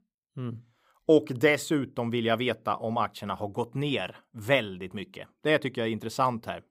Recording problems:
none

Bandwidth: 15.5 kHz